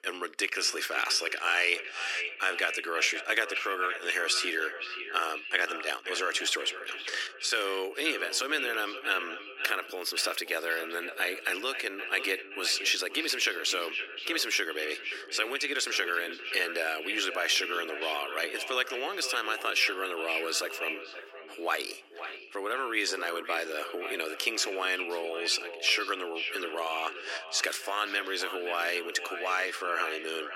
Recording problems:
echo of what is said; strong; throughout; 520 ms later, 8 dB below the speech
thin; very; fading below 300 Hz

